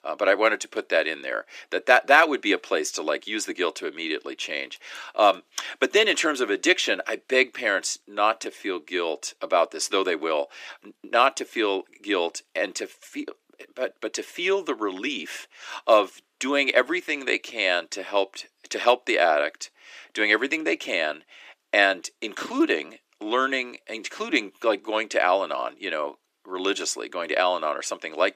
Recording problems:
thin; somewhat; fading below 300 Hz

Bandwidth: 14.5 kHz